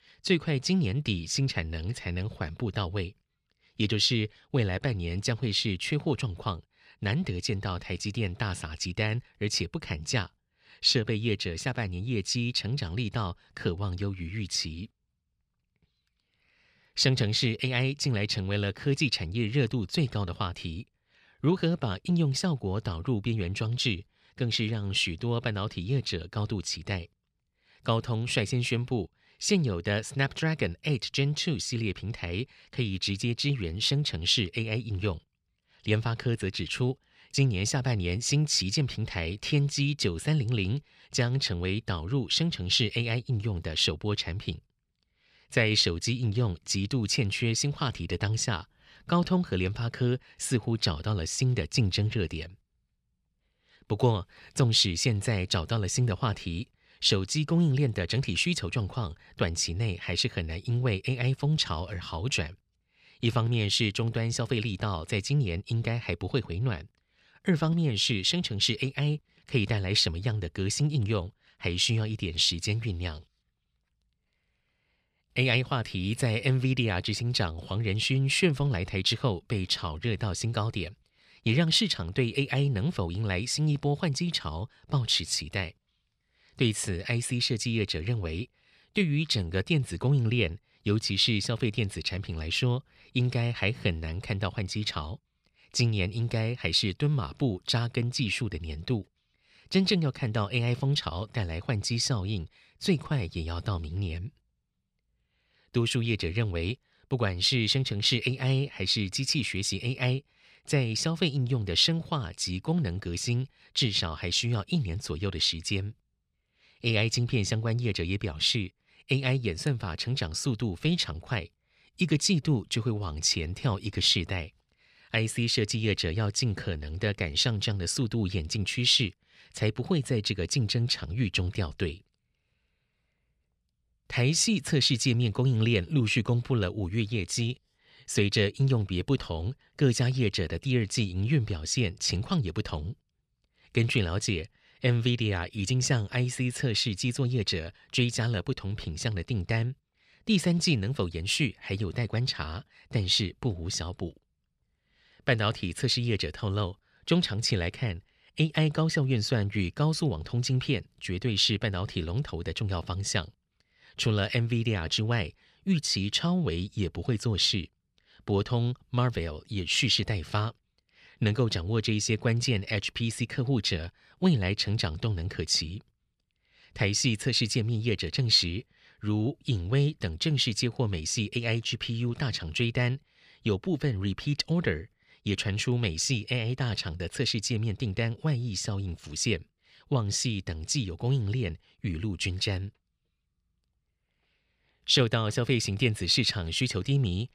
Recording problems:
none

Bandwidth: 14.5 kHz